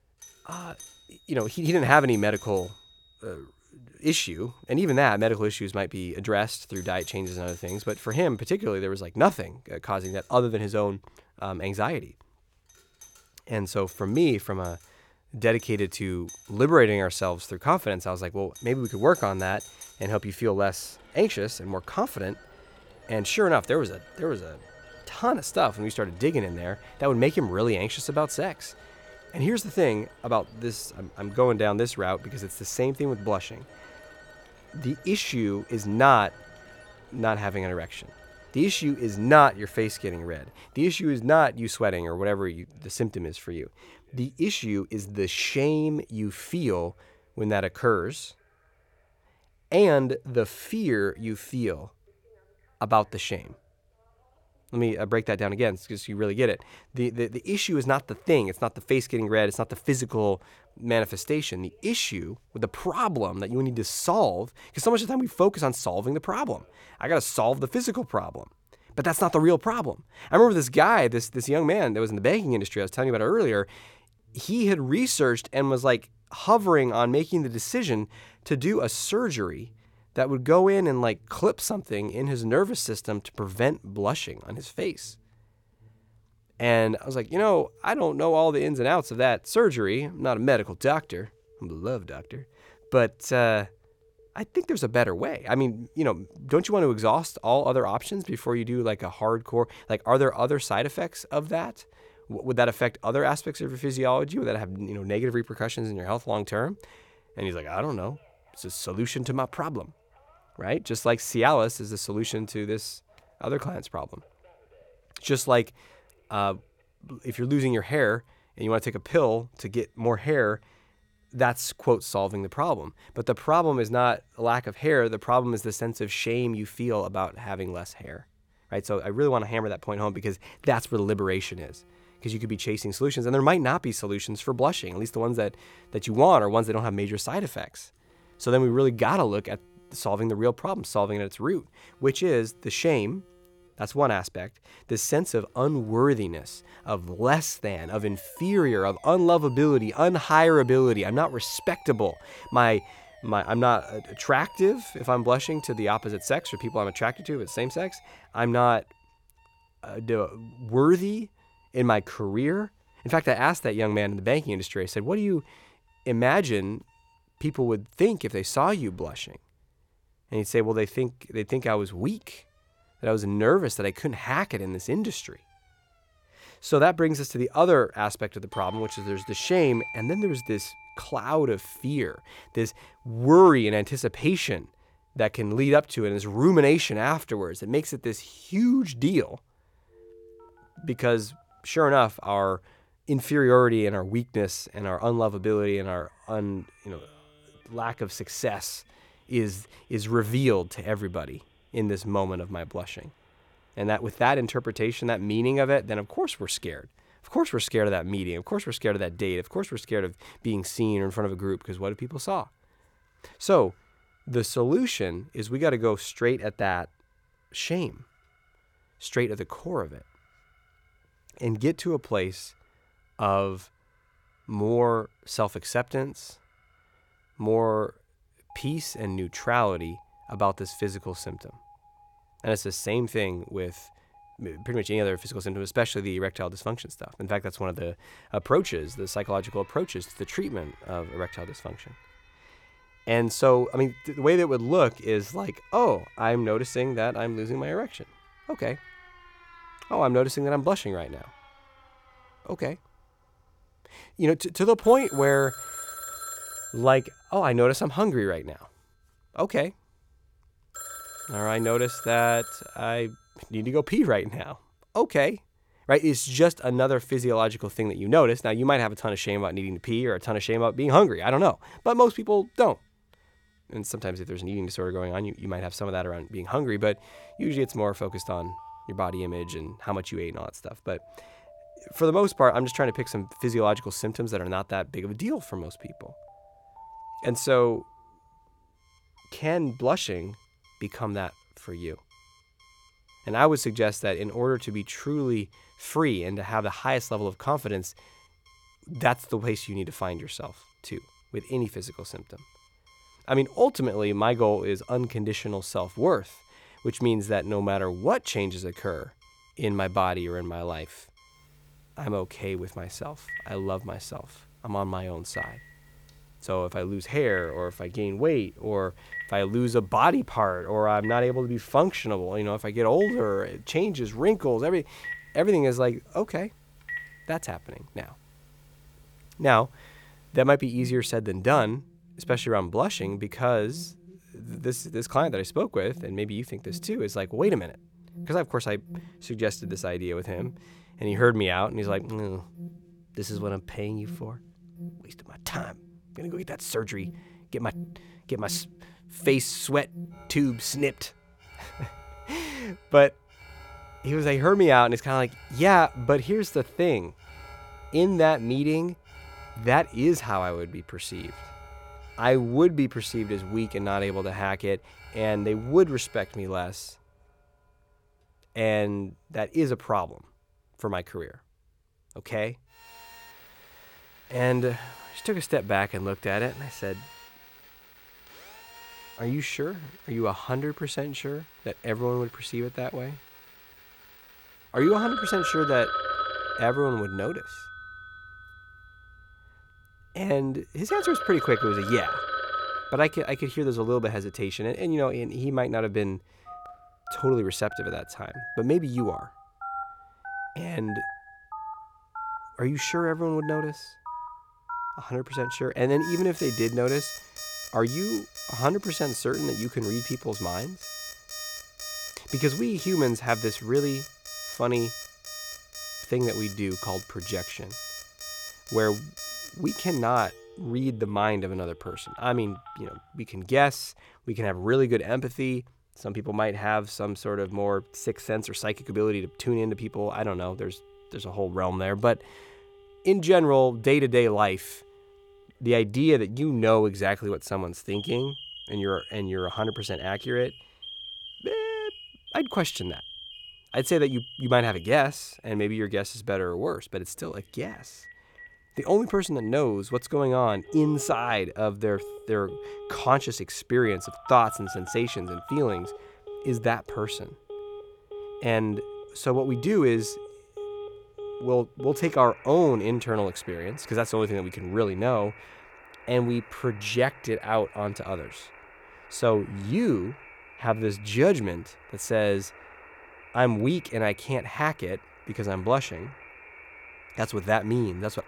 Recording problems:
alarms or sirens; noticeable; throughout; 15 dB below the speech

